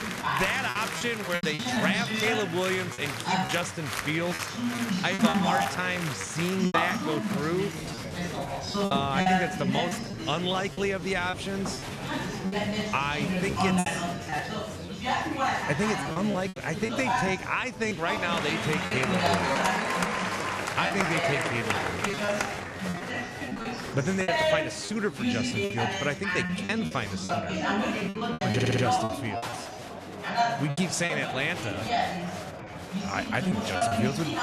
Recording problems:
chatter from many people; very loud; throughout; 1 dB above the speech
choppy; very; 9% of the speech affected
audio stuttering; at 29 s

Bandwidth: 13.5 kHz